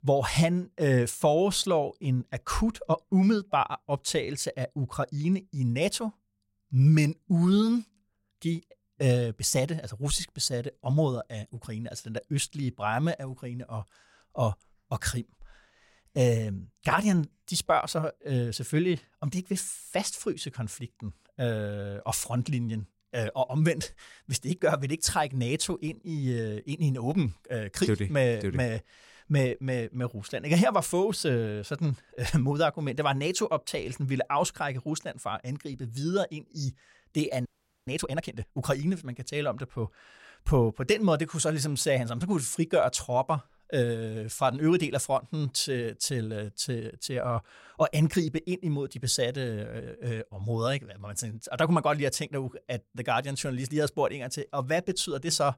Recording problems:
audio freezing; at 37 s

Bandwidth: 16 kHz